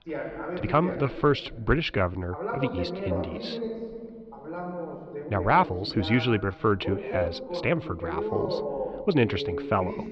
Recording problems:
muffled; very slightly; fading above 4.5 kHz
voice in the background; loud; throughout; 7 dB below the speech
uneven, jittery; strongly; from 0.5 to 9 s

